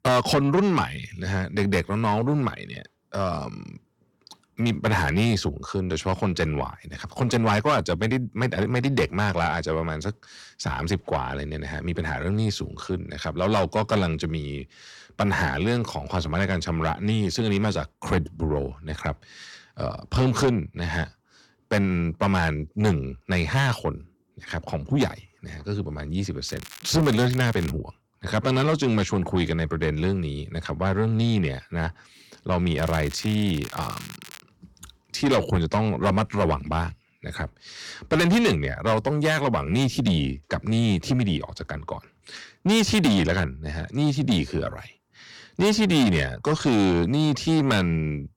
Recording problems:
distortion; heavy; 8 dB below the speech
crackling; noticeable; from 26 to 28 s and from 33 to 34 s; 15 dB below the speech

